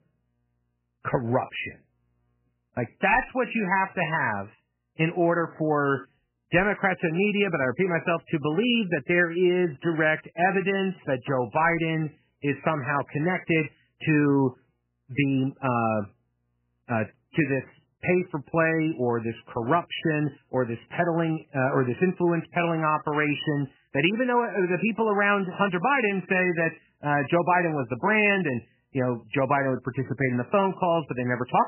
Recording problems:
garbled, watery; badly; nothing above 3 kHz

